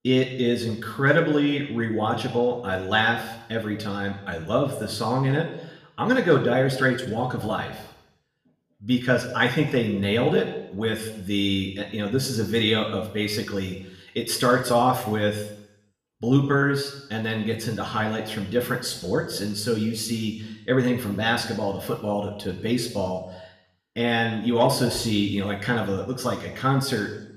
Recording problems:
room echo; slight; dies away in 0.8 s
off-mic speech; somewhat distant

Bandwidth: 14.5 kHz